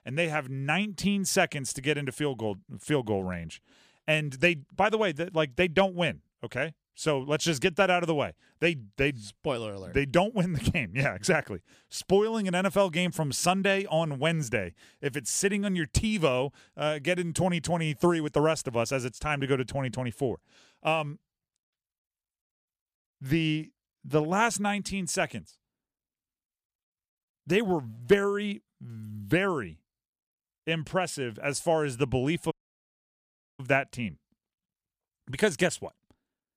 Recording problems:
audio cutting out; at 33 s for 1 s

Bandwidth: 14.5 kHz